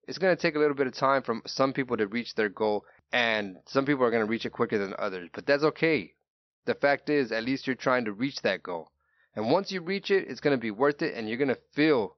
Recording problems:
high frequencies cut off; noticeable; nothing above 6 kHz

